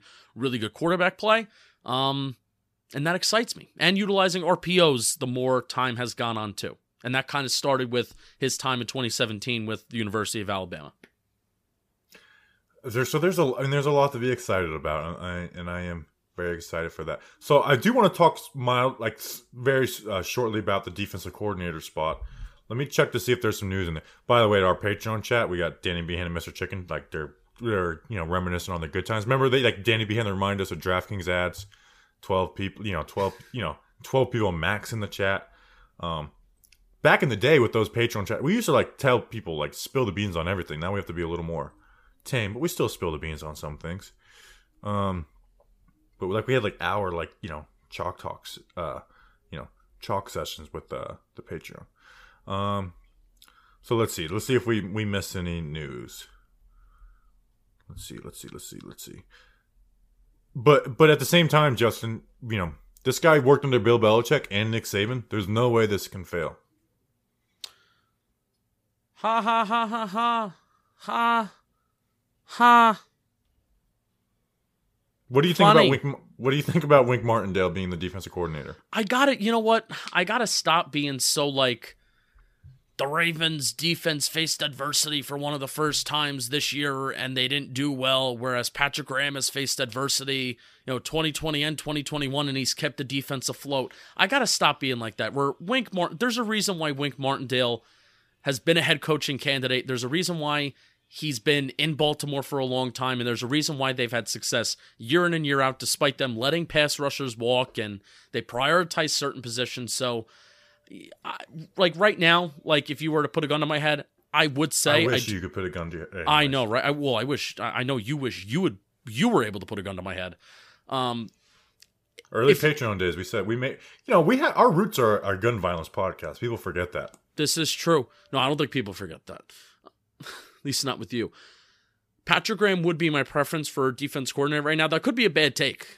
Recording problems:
none

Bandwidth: 15 kHz